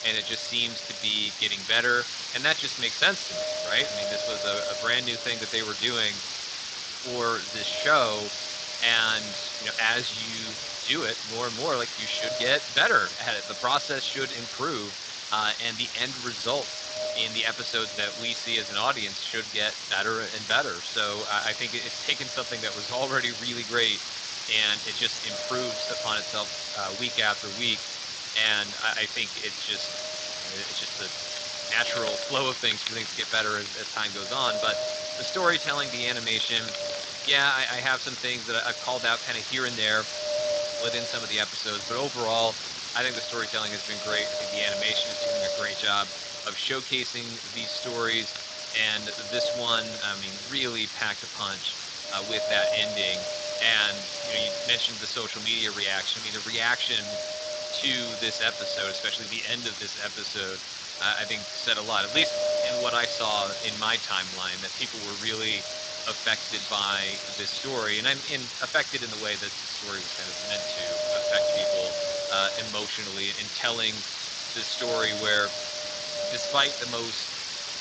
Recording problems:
thin; somewhat; fading below 450 Hz
garbled, watery; slightly
wind noise on the microphone; heavy; 8 dB below the speech
hiss; loud; throughout; 5 dB below the speech
animal sounds; faint; throughout; 20 dB below the speech

